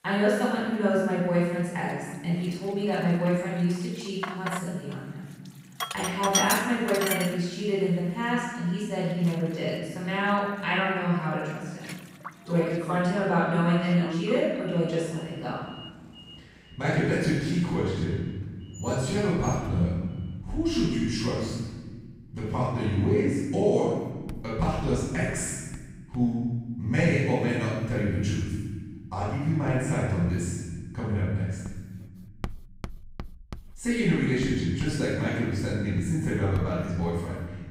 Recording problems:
room echo; strong; dies away in 1.5 s
off-mic speech; far
household noises; loud; throughout; 10 dB below the speech

